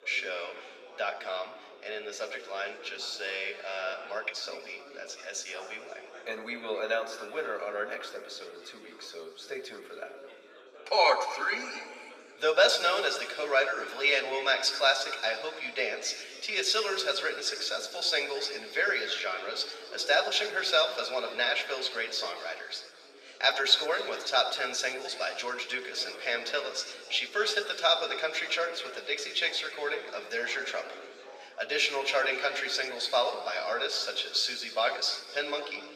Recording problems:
thin; very; fading below 400 Hz
room echo; noticeable; dies away in 2.1 s
off-mic speech; somewhat distant
background chatter; faint; throughout; 4 voices, 20 dB below the speech

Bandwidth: 14.5 kHz